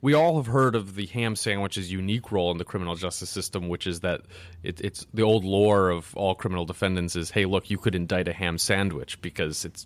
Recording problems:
none

